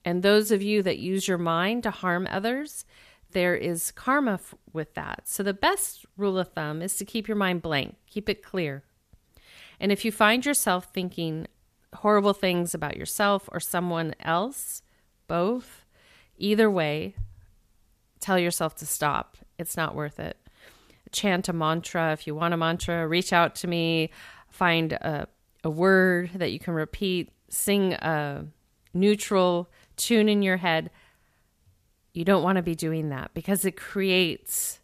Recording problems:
none

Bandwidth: 14.5 kHz